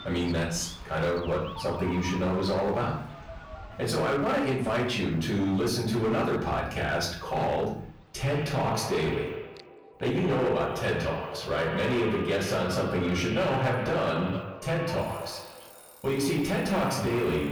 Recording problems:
echo of what is said; strong; from 8 s on; 120 ms later, 8 dB below the speech
off-mic speech; far
room echo; noticeable; dies away in 0.5 s
distortion; slight; 12% of the sound clipped
alarms or sirens; noticeable; throughout; 15 dB below the speech
animal sounds; faint; throughout; 20 dB below the speech

